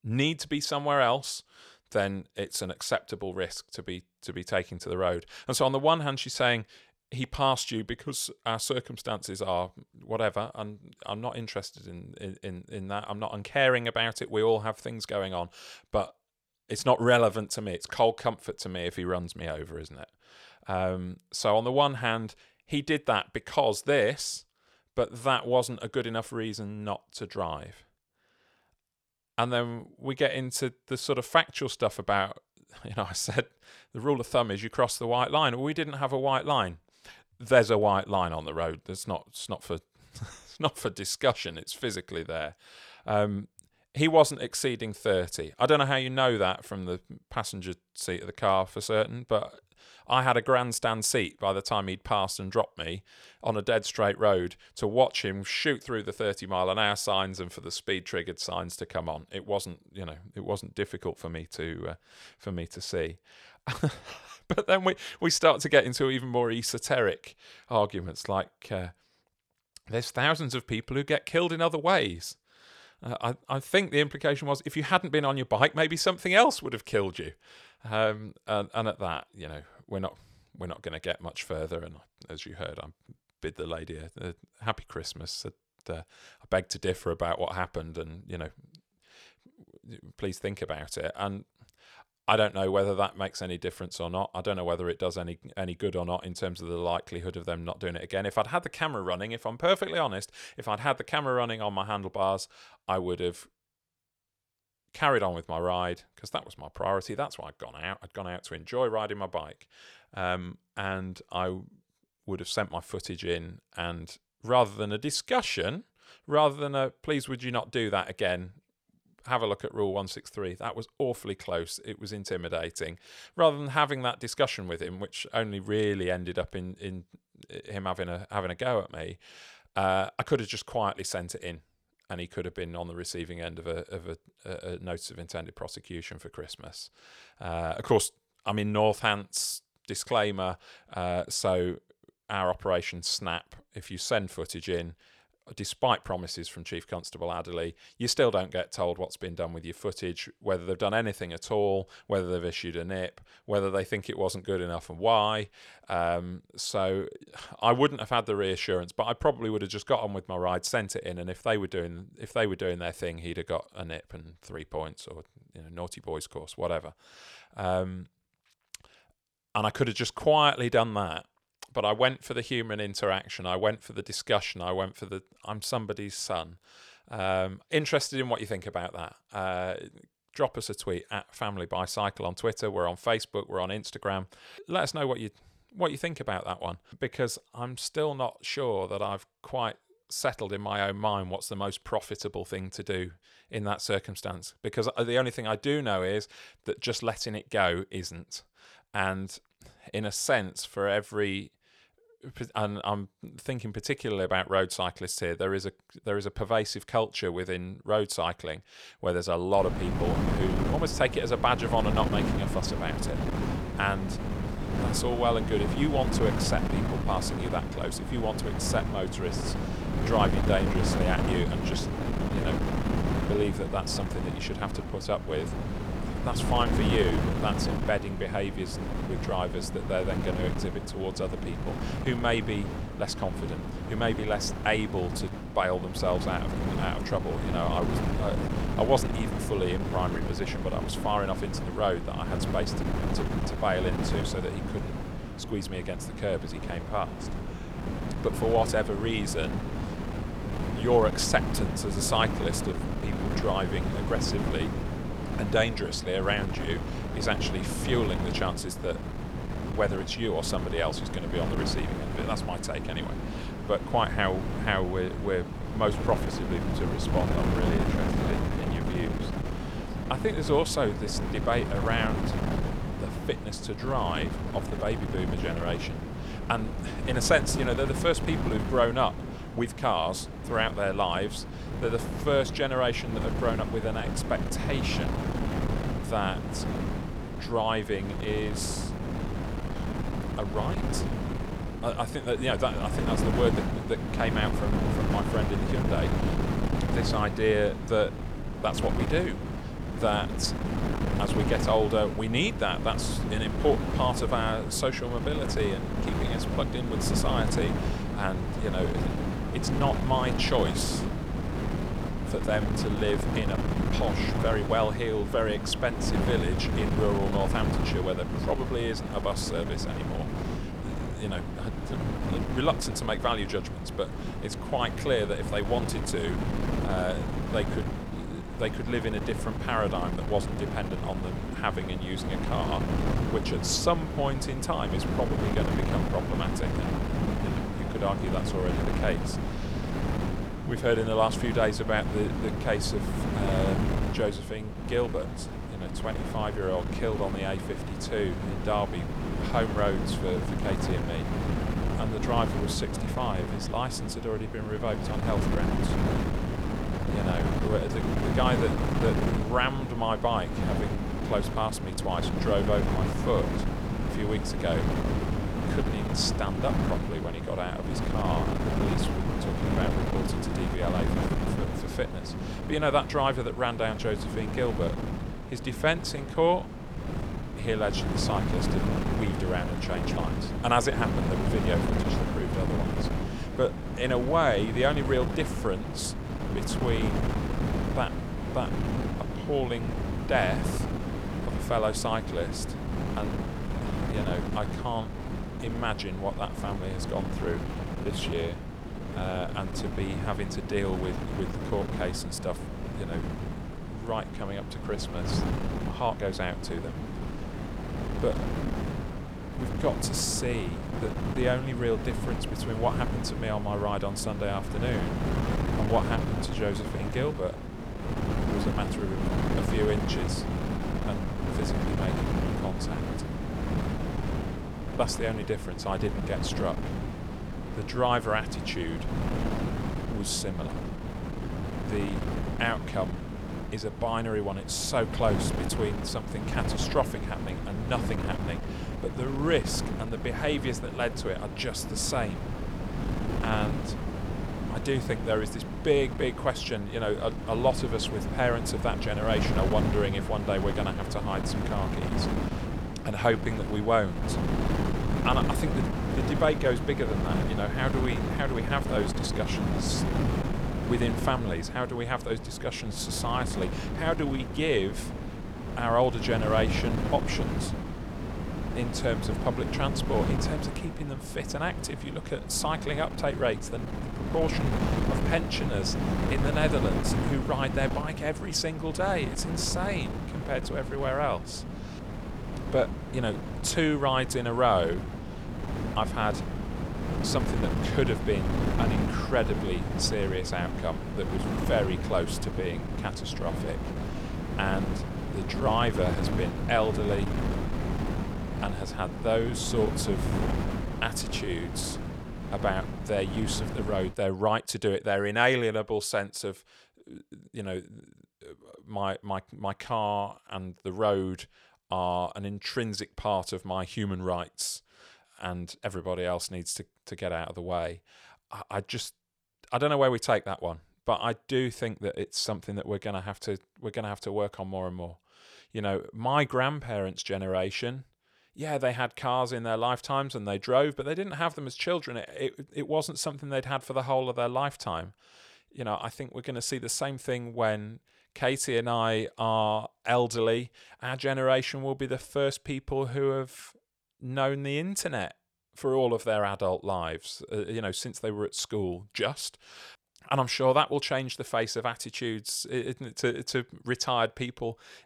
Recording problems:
wind noise on the microphone; heavy; from 3:30 to 8:24; 7 dB below the speech

